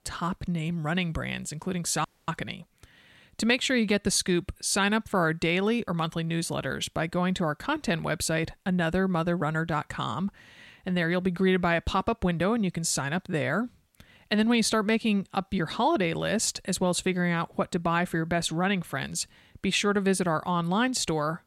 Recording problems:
audio cutting out; at 2 s

